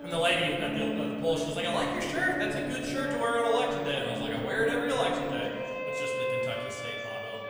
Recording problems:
off-mic speech; far
room echo; noticeable; dies away in 1.9 s
background music; loud; throughout; 5 dB below the speech
chatter from many people; faint; throughout; 20 dB below the speech

